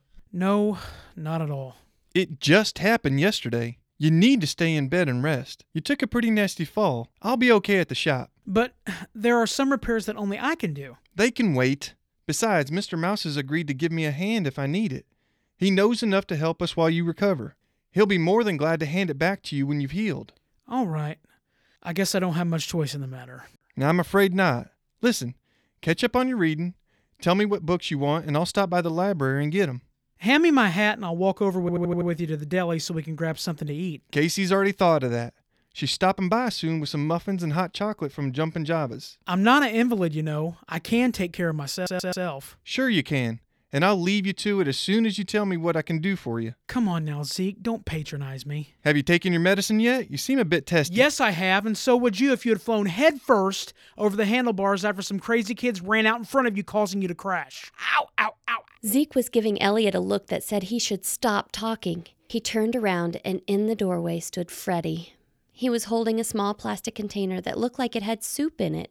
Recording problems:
audio stuttering; at 32 s and at 42 s

